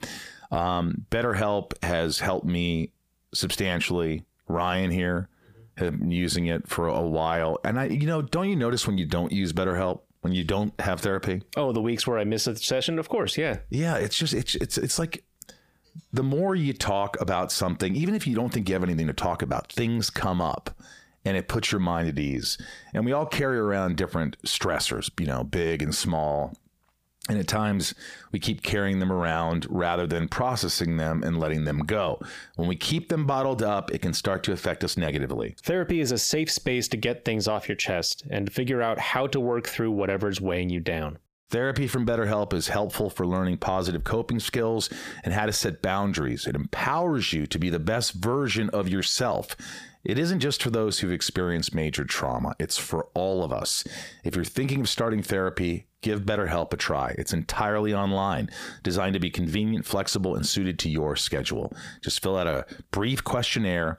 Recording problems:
squashed, flat; heavily

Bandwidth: 15 kHz